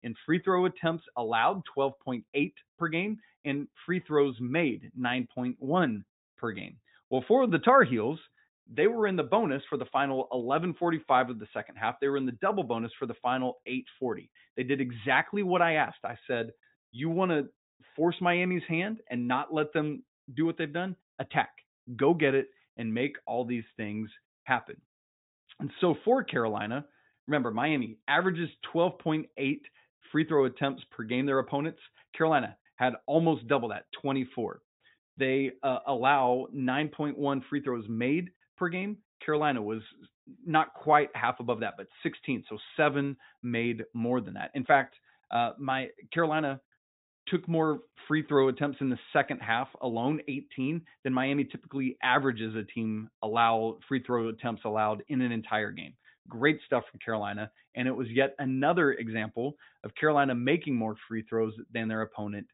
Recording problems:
high frequencies cut off; severe; nothing above 4 kHz

